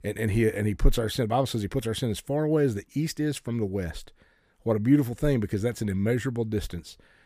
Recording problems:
none

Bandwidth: 15 kHz